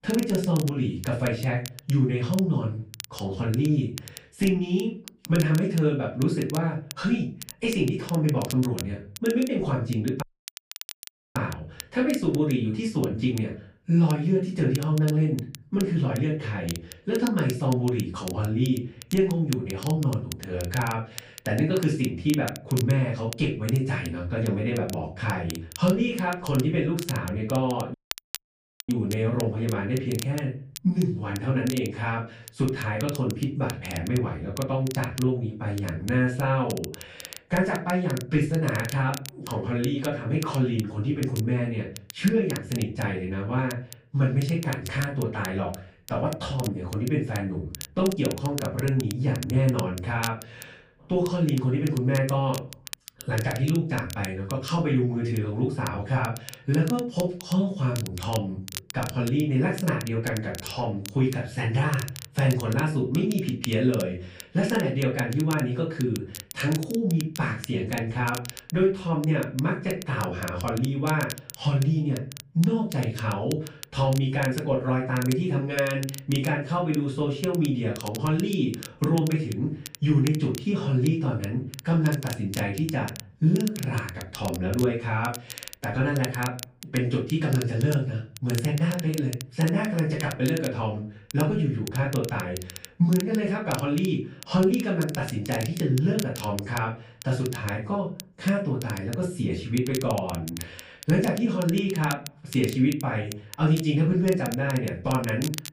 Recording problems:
off-mic speech; far
room echo; slight; dies away in 0.4 s
crackle, like an old record; noticeable; 15 dB below the speech
audio cutting out; at 10 s for 1 s and at 28 s for 1 s

